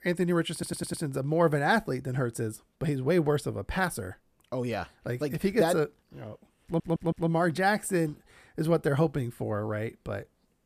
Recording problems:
audio stuttering; at 0.5 s and at 6.5 s

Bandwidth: 14.5 kHz